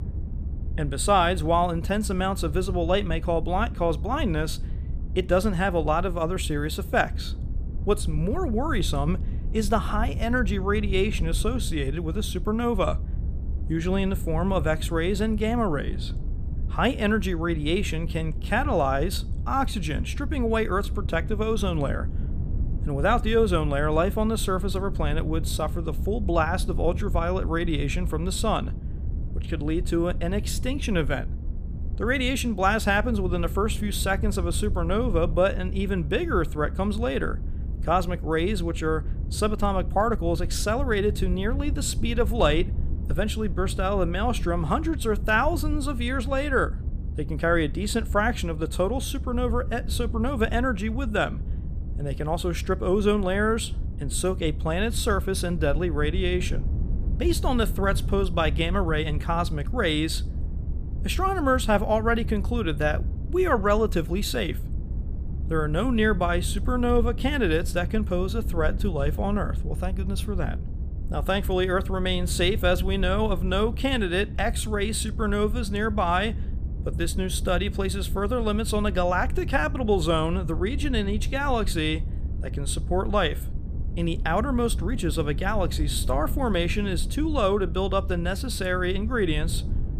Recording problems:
low rumble; noticeable; throughout; 20 dB below the speech

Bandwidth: 15 kHz